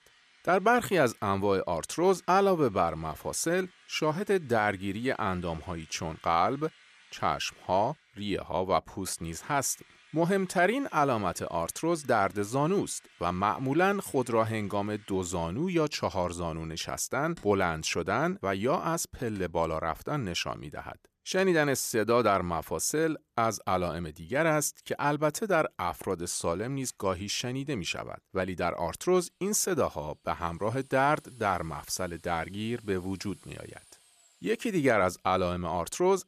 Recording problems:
machinery noise; faint; throughout; 30 dB below the speech

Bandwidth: 14.5 kHz